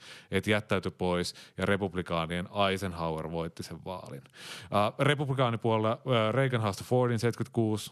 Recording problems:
none

